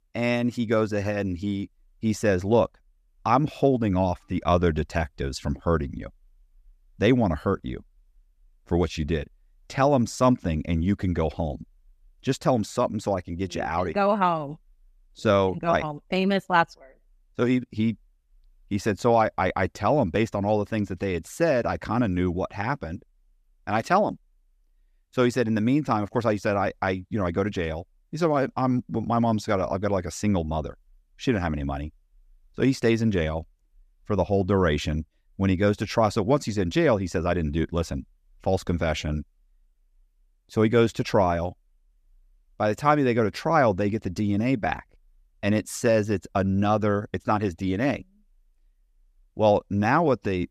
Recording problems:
none

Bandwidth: 14.5 kHz